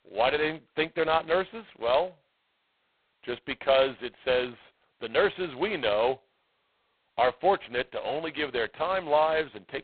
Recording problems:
phone-call audio; poor line; nothing above 4 kHz

